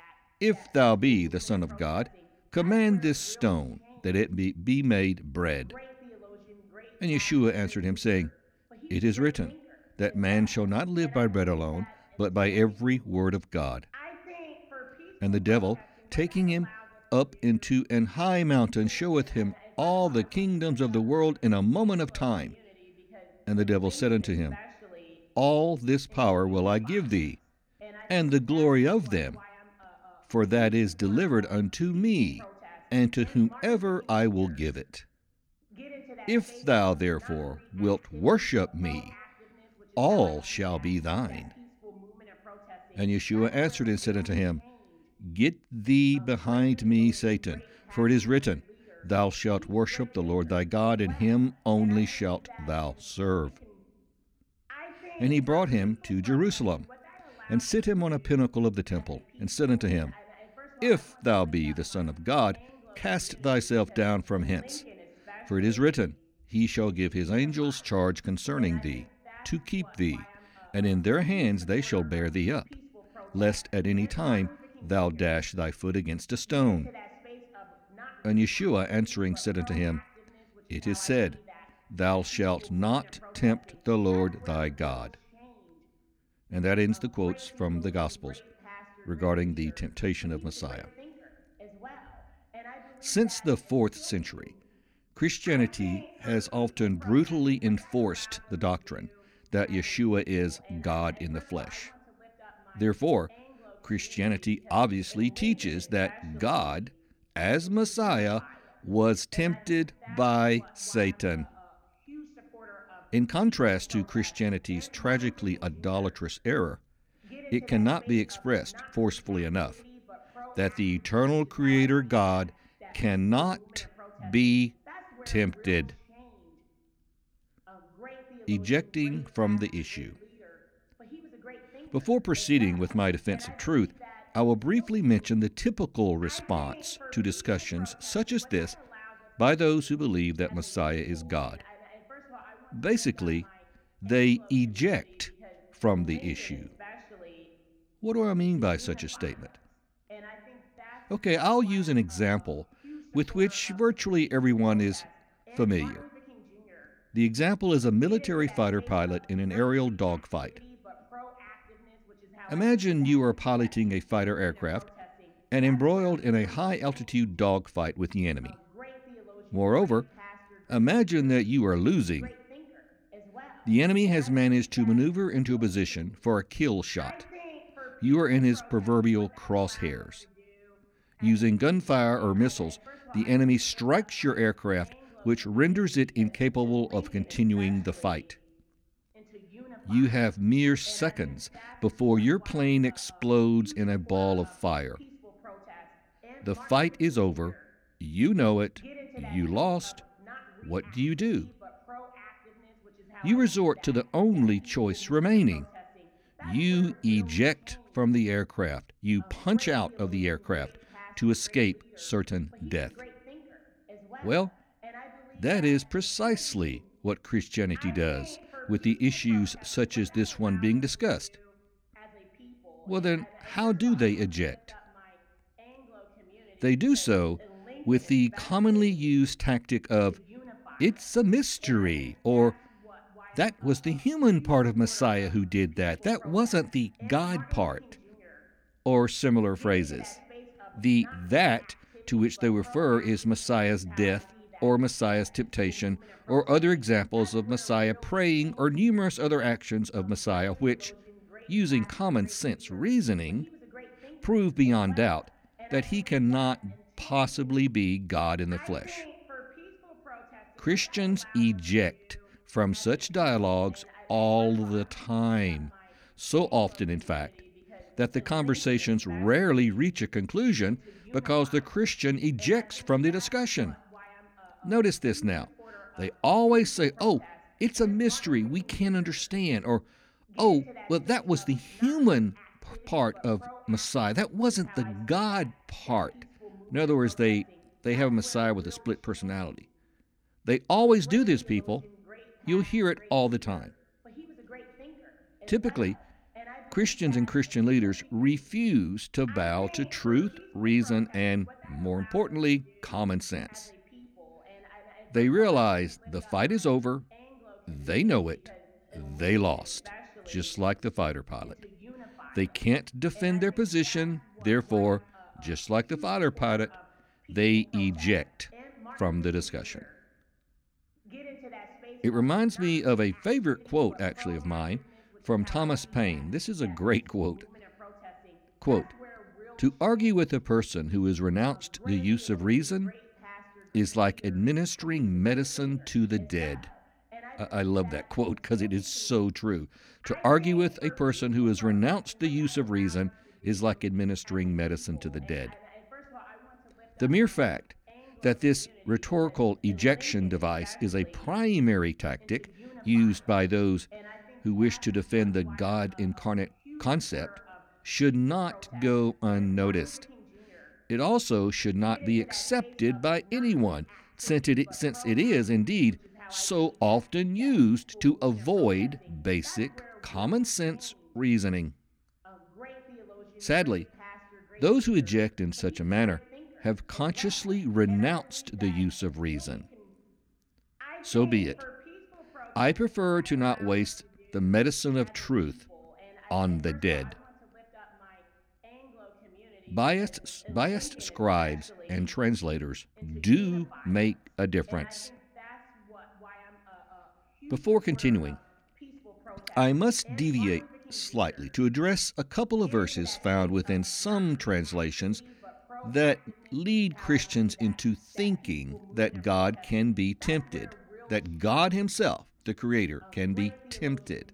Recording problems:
voice in the background; faint; throughout; 25 dB below the speech

